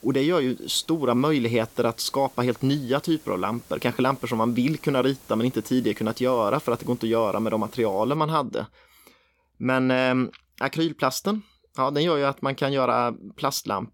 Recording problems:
hiss; faint; until 8 s; 25 dB below the speech

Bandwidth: 17 kHz